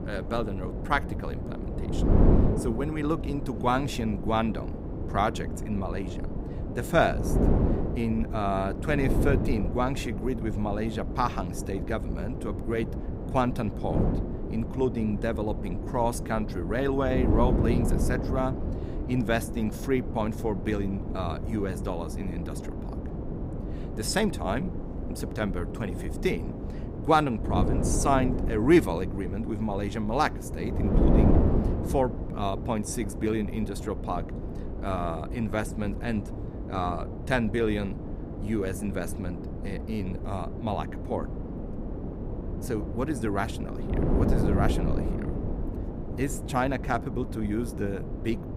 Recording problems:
wind noise on the microphone; heavy; 7 dB below the speech

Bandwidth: 15.5 kHz